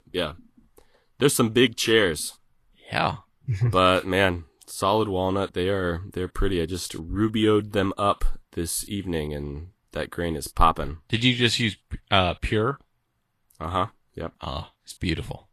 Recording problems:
garbled, watery; slightly; nothing above 12.5 kHz

